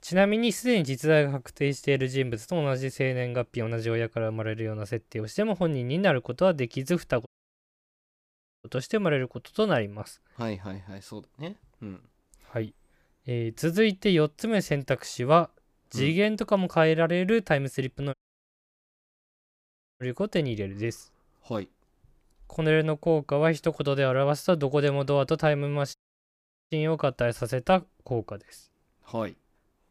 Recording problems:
audio cutting out; at 7.5 s for 1.5 s, at 18 s for 2 s and at 26 s for 1 s

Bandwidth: 15 kHz